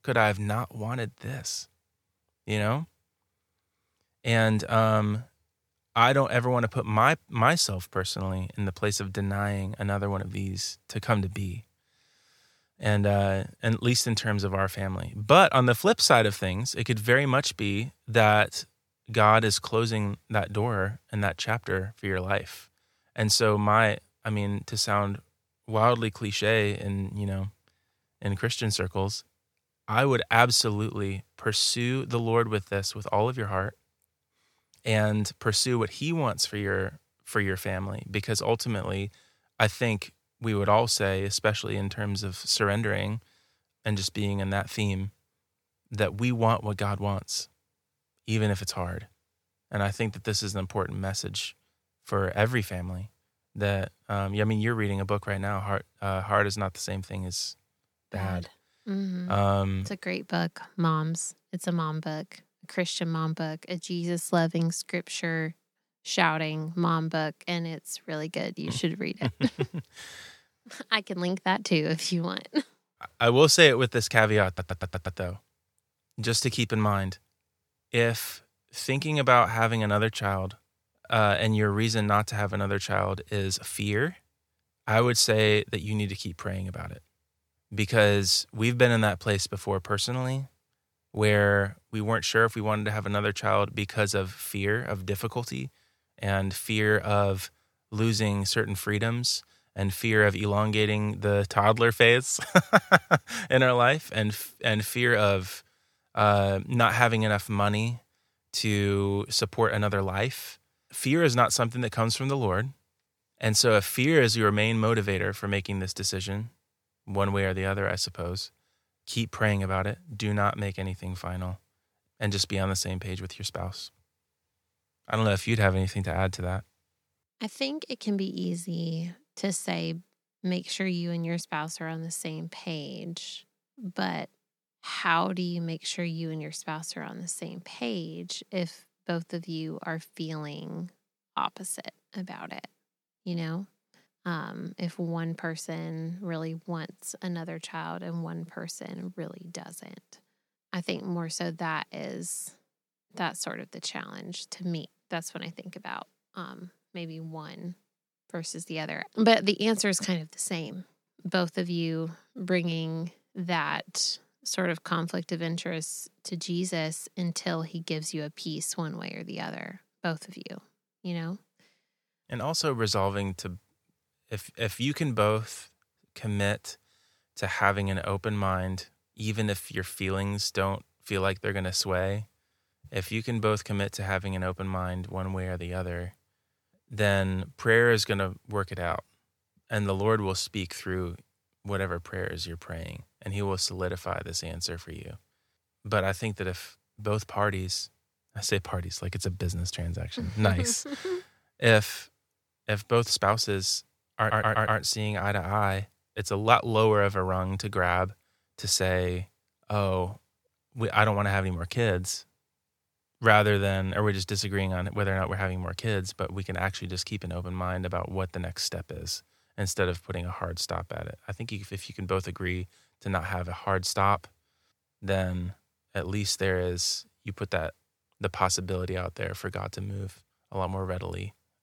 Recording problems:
audio stuttering; at 1:14 and at 3:24

